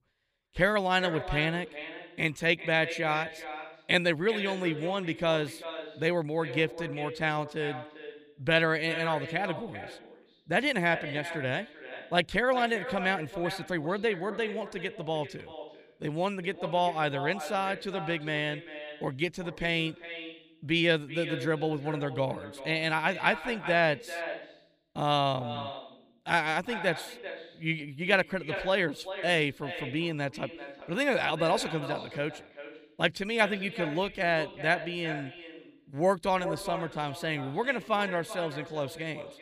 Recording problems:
echo of what is said; strong; throughout; 390 ms later, 10 dB below the speech

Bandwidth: 15 kHz